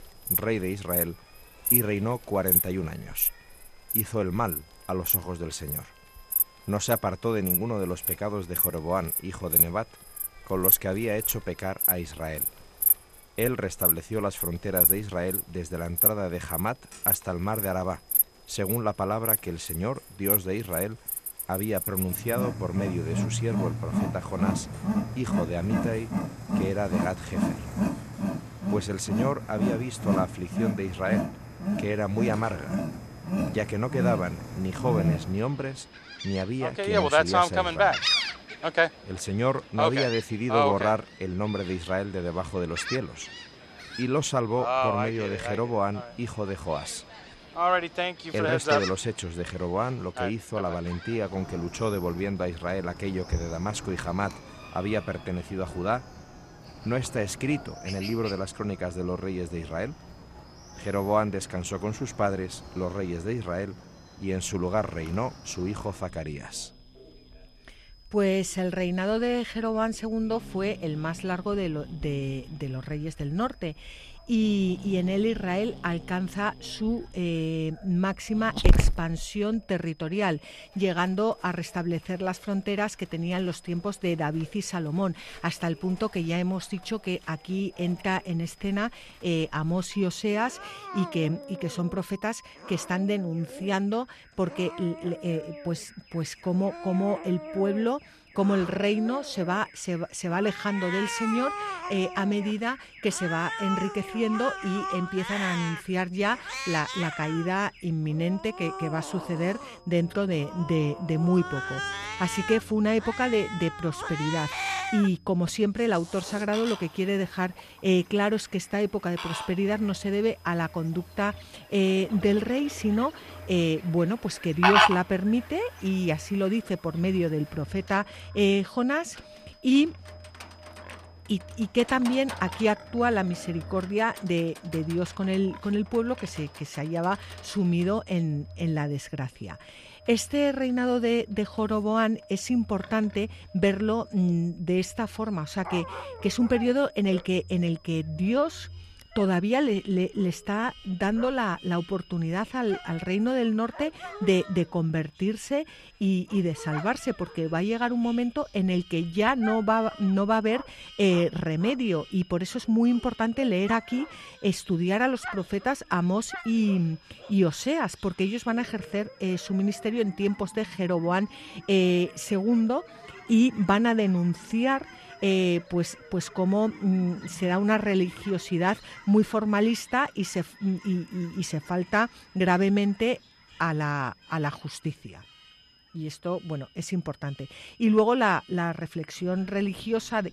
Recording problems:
animal sounds; loud; throughout; 1 dB below the speech
high-pitched whine; faint; throughout; 5 kHz, 30 dB below the speech
alarms or sirens; faint; throughout; 25 dB below the speech

